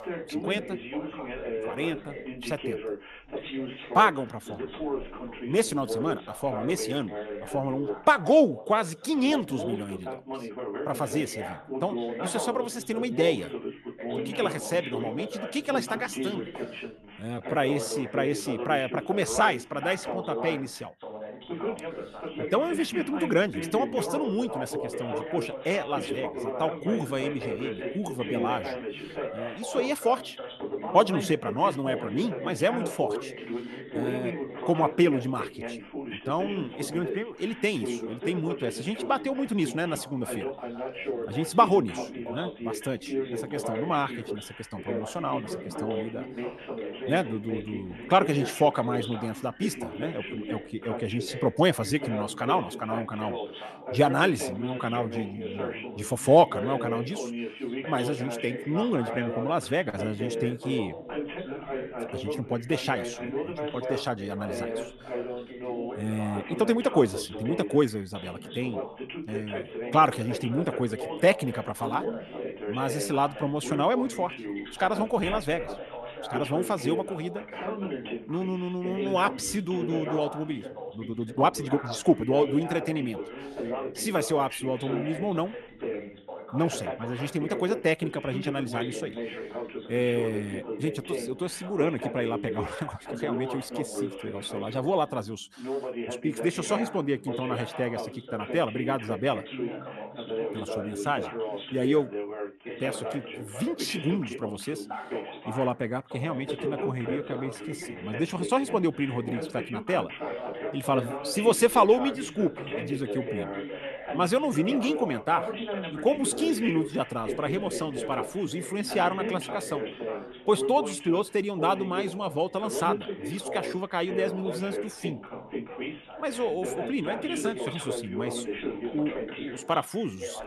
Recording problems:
background chatter; loud; throughout; 2 voices, 7 dB below the speech
uneven, jittery; strongly; from 17 s to 1:48

